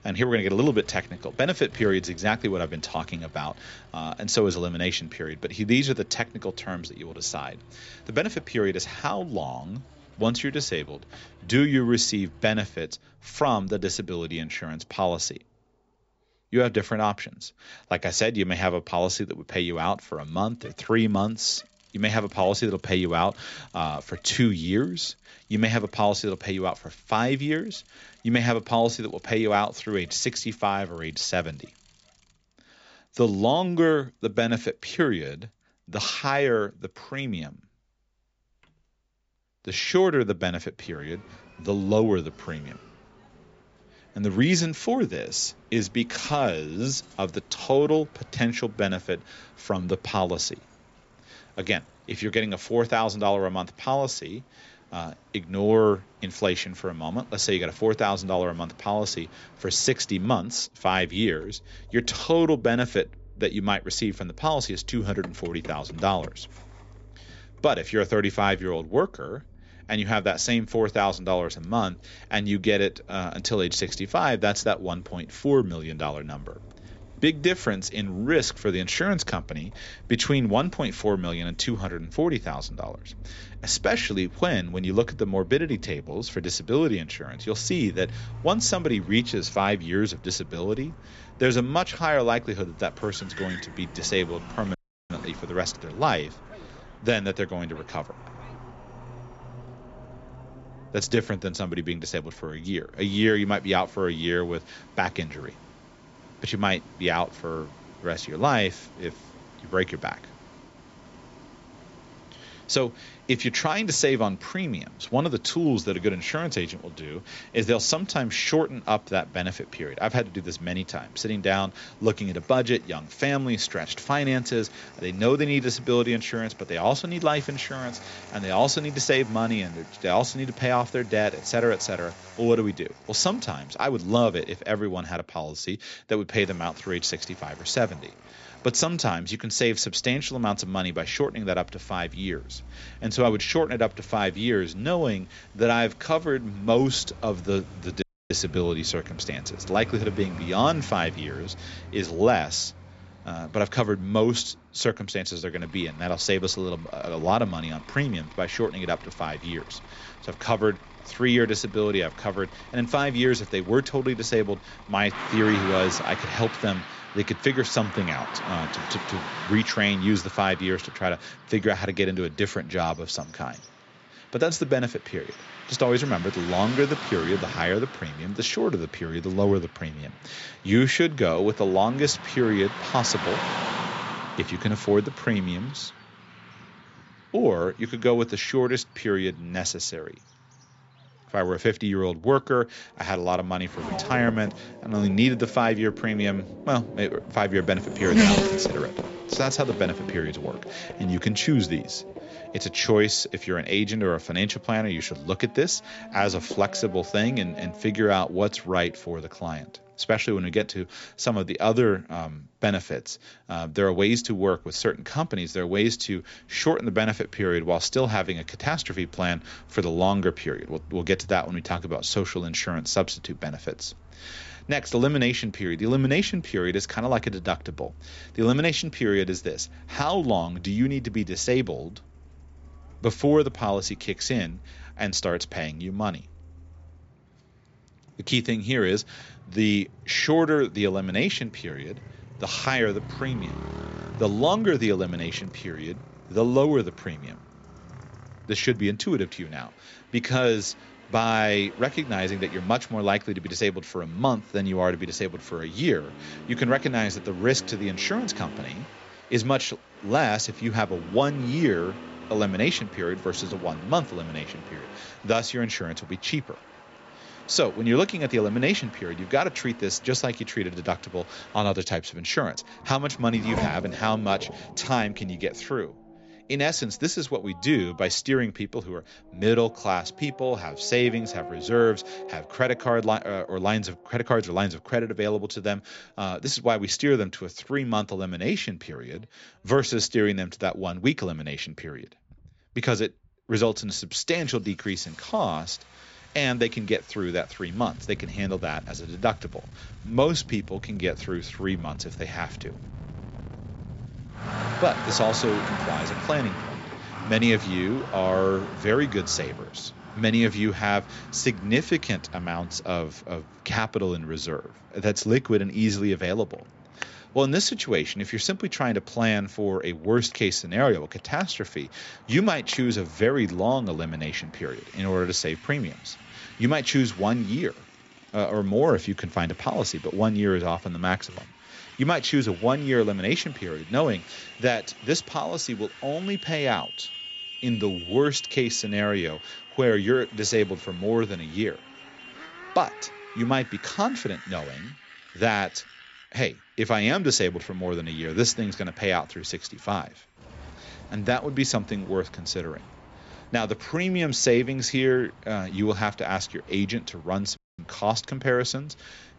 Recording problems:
high frequencies cut off; noticeable; nothing above 8 kHz
traffic noise; noticeable; throughout; 15 dB below the speech
audio cutting out; at 1:35, at 2:28 and at 5:58

